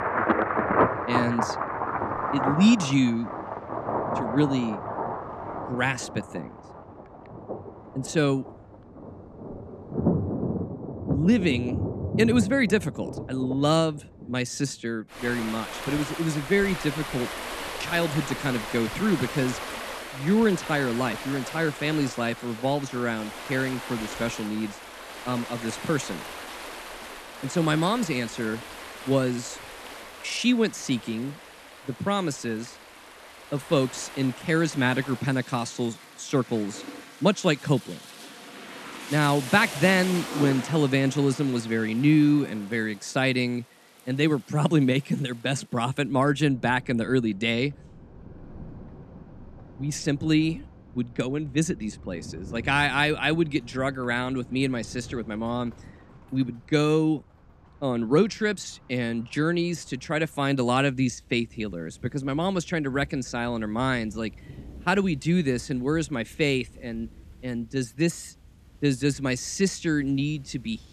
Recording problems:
rain or running water; loud; throughout; 8 dB below the speech

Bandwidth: 14 kHz